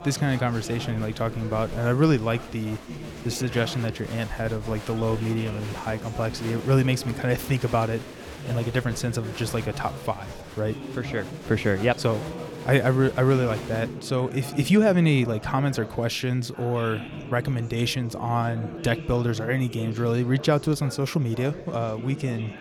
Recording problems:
murmuring crowd; noticeable; throughout; 10 dB below the speech

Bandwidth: 17 kHz